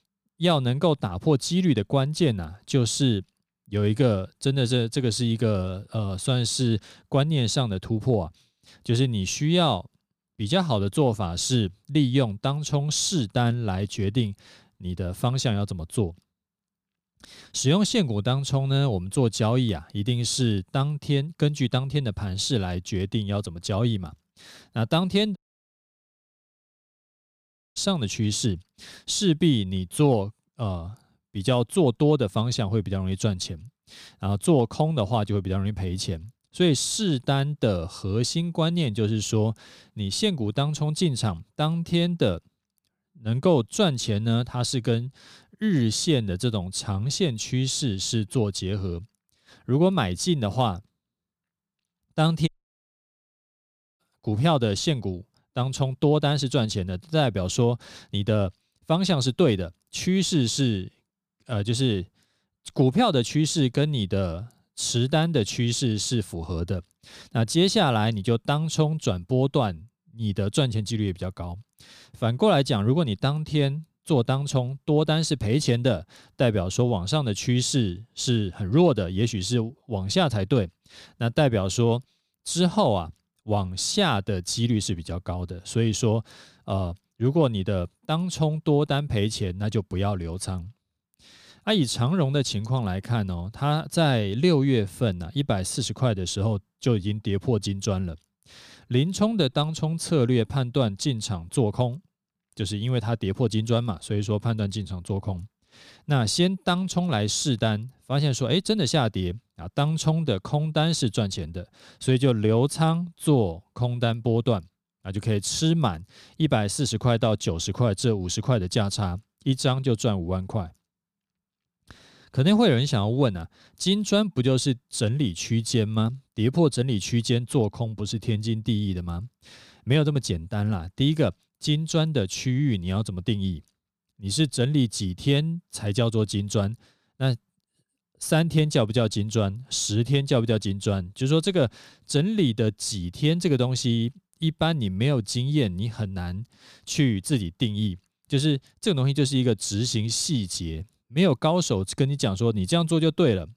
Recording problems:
audio cutting out; at 25 s for 2.5 s and at 52 s for 1.5 s

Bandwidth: 15 kHz